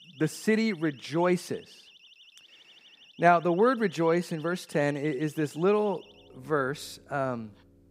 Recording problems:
alarms or sirens; faint; throughout; 25 dB below the speech

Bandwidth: 15.5 kHz